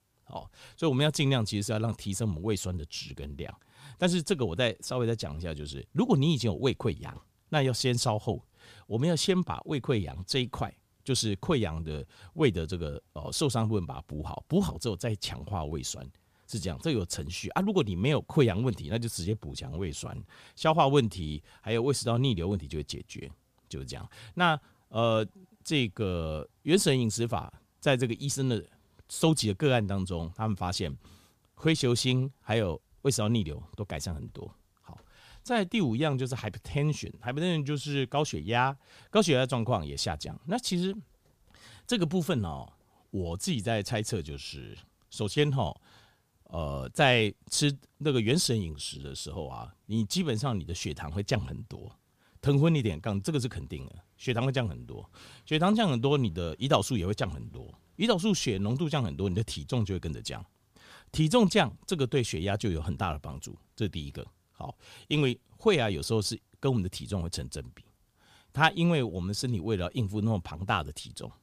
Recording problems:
none

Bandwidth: 15 kHz